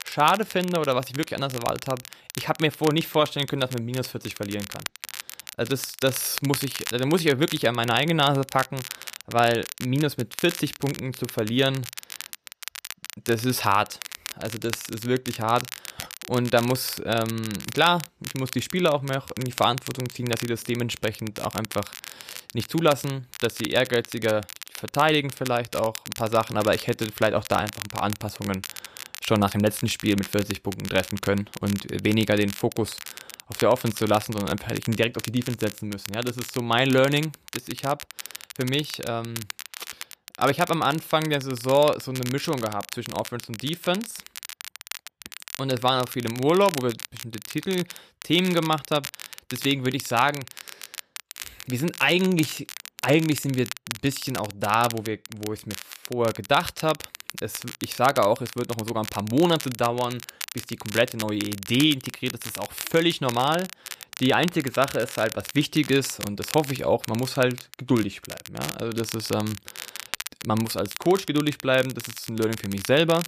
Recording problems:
crackle, like an old record; noticeable; 10 dB below the speech

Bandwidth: 14.5 kHz